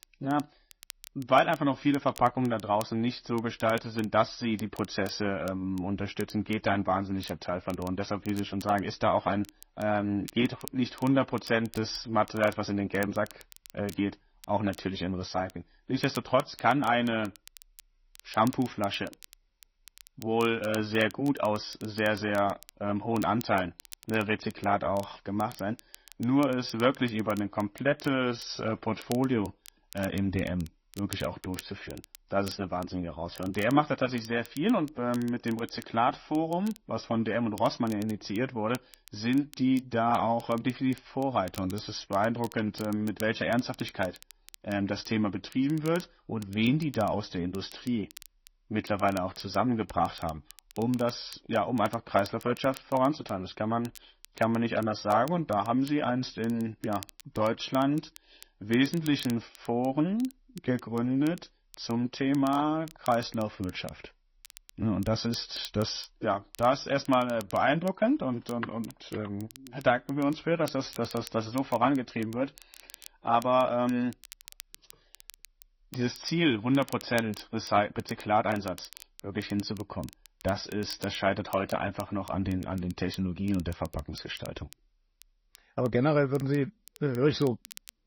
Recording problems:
garbled, watery; slightly; nothing above 6 kHz
crackle, like an old record; faint; 20 dB below the speech

